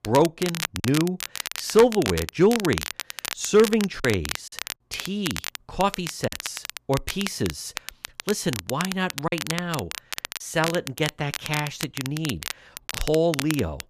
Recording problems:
crackle, like an old record; loud; 7 dB below the speech
choppy; occasionally; 2% of the speech affected

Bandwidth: 14.5 kHz